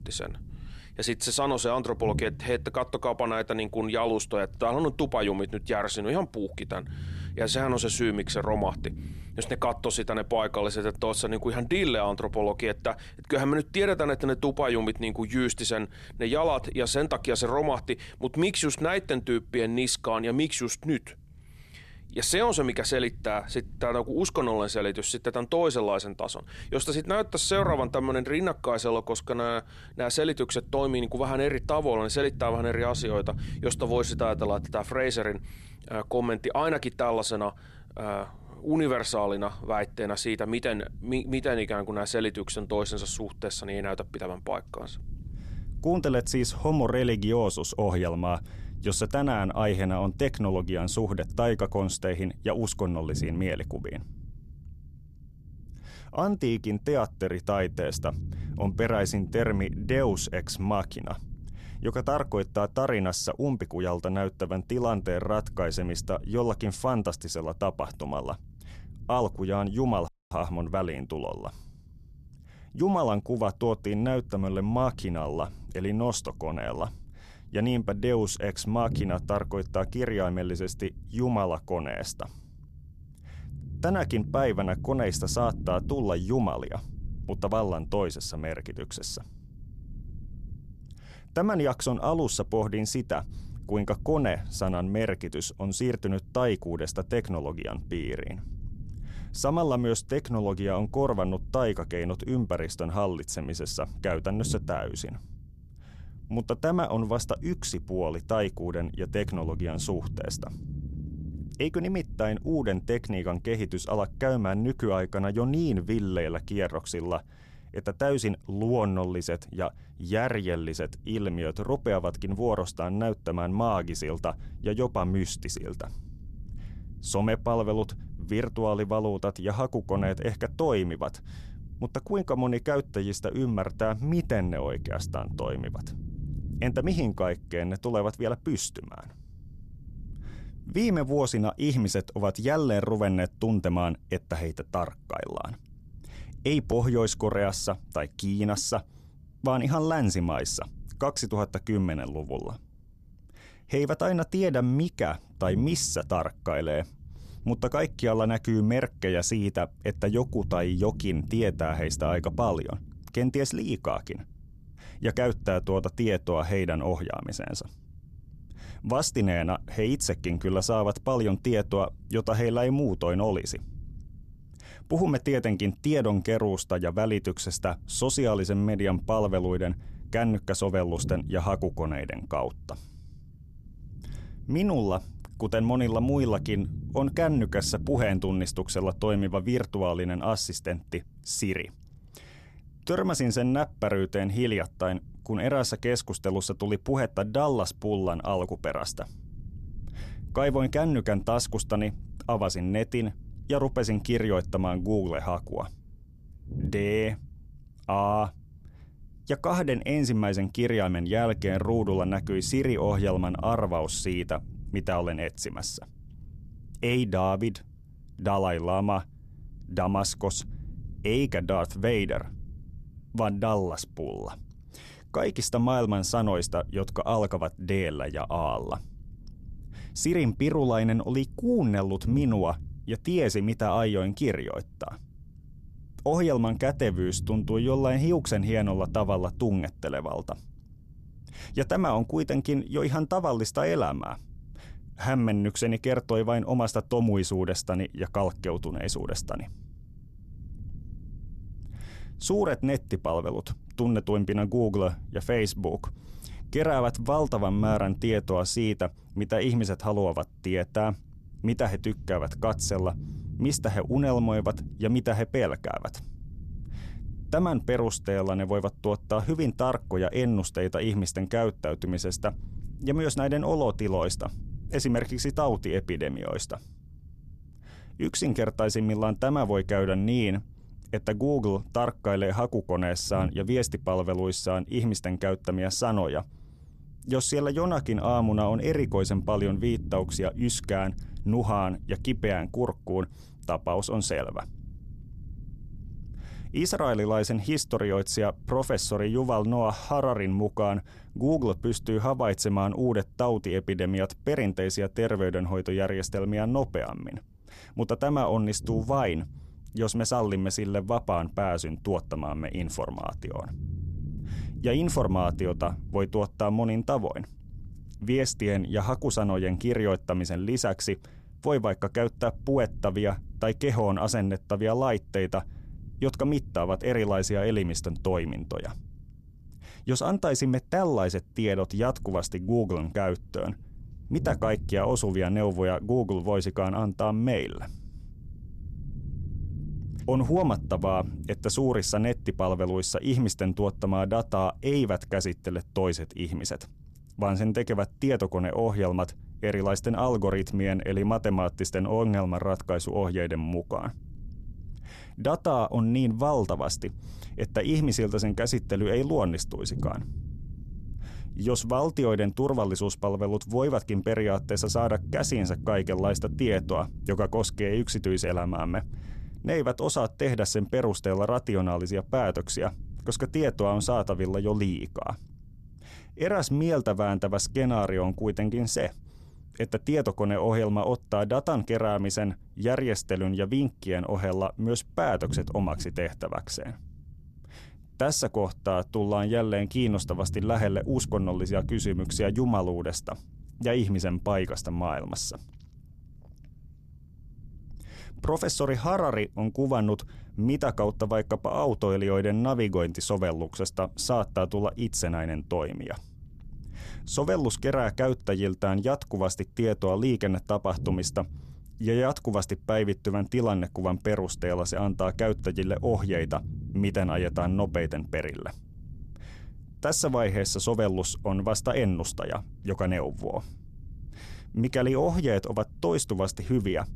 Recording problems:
low rumble; faint; throughout; 25 dB below the speech
audio cutting out; at 1:10

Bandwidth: 13.5 kHz